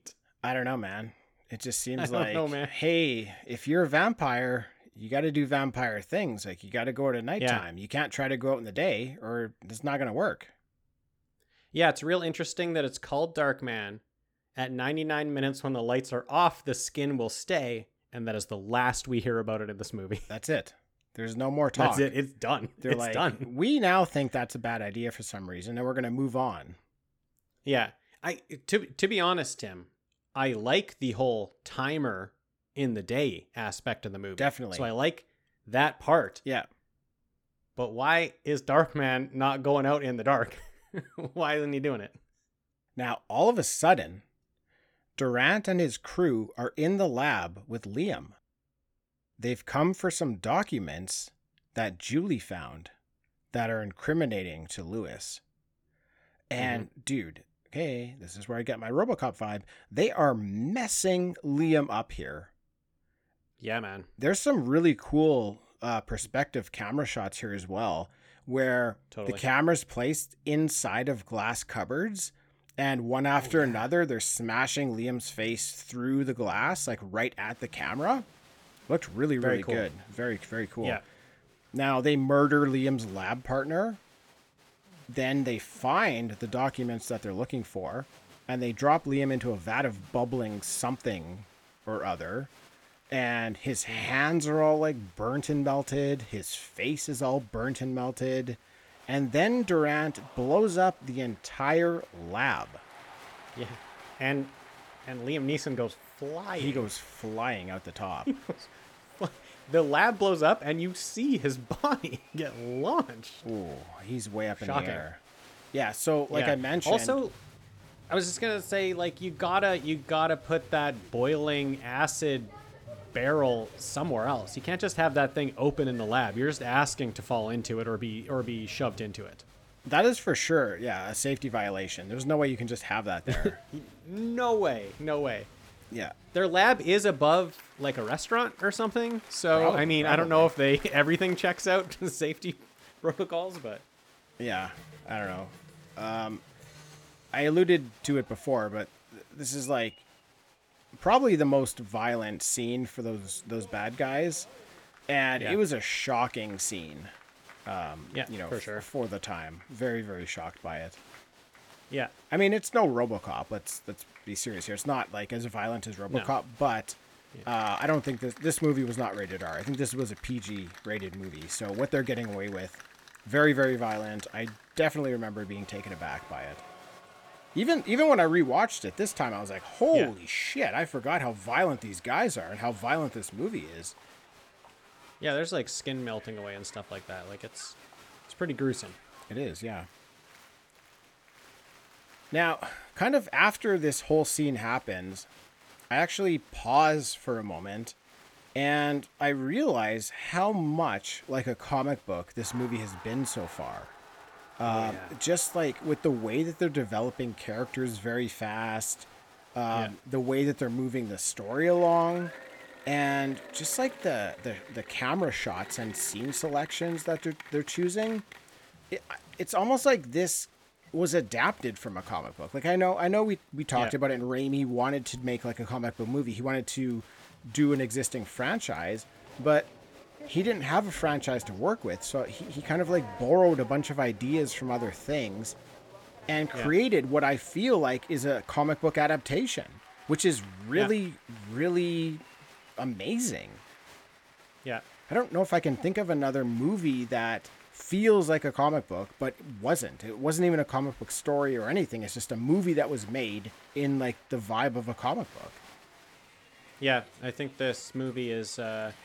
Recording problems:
crowd noise; faint; from 1:17 on; 20 dB below the speech

